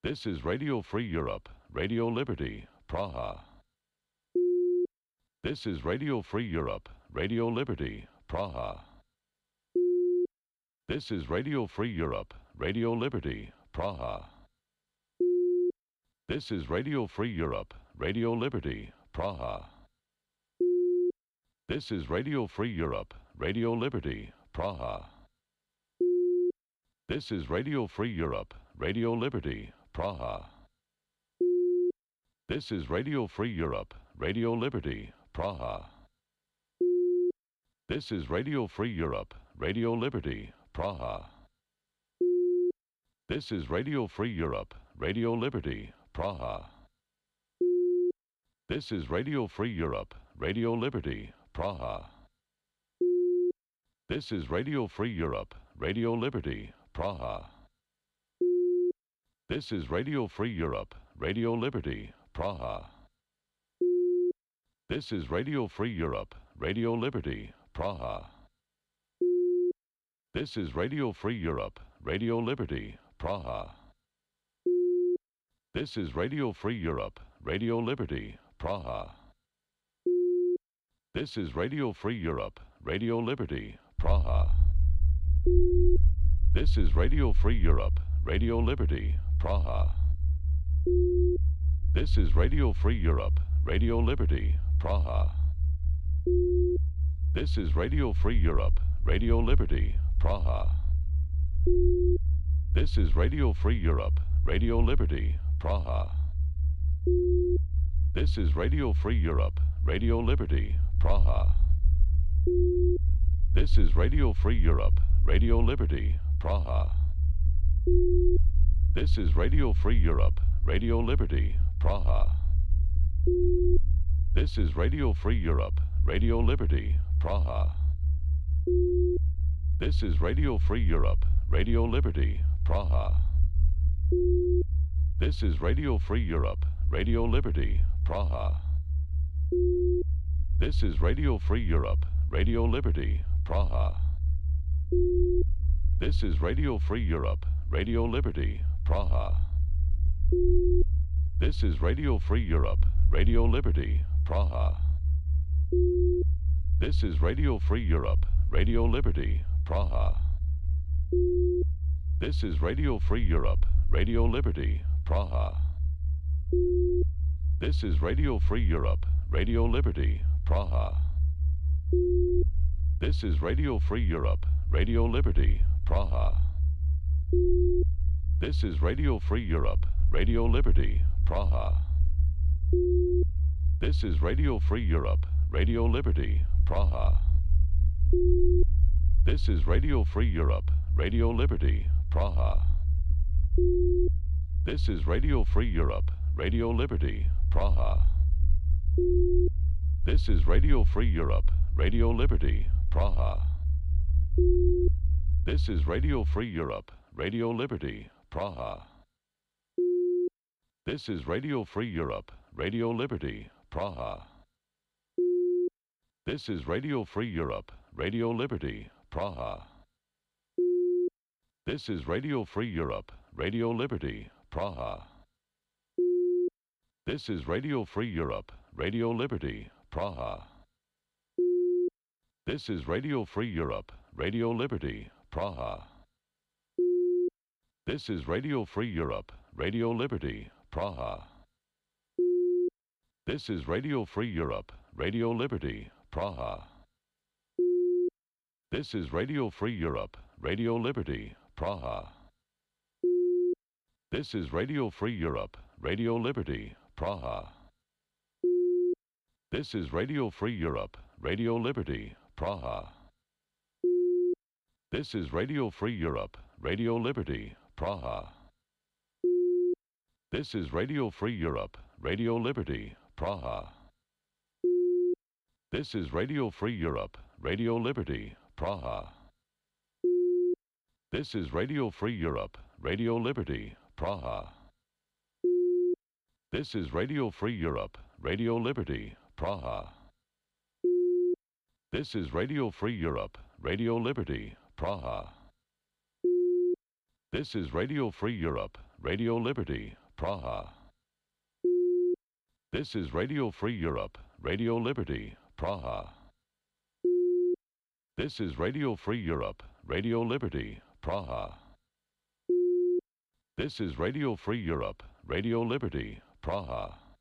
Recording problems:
low rumble; noticeable; from 1:24 to 3:26; 15 dB below the speech

